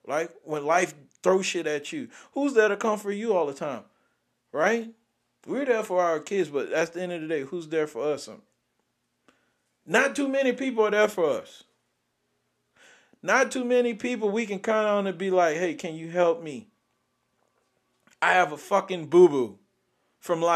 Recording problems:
abrupt cut into speech; at the end

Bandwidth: 14 kHz